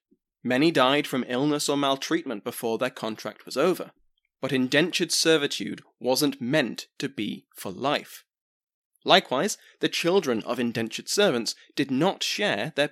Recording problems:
none

